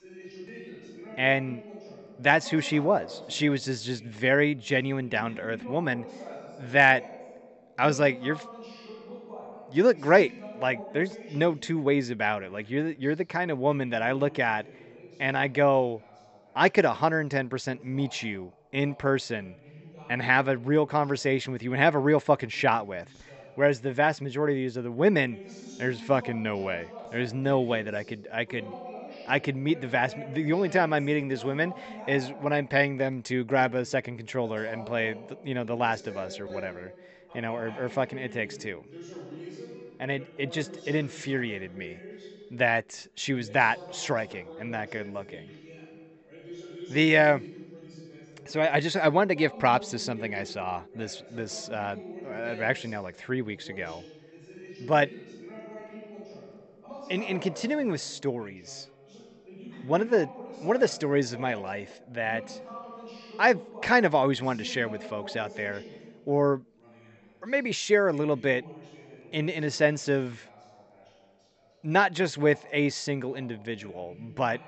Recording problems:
high frequencies cut off; noticeable; nothing above 8 kHz
voice in the background; noticeable; throughout; 20 dB below the speech

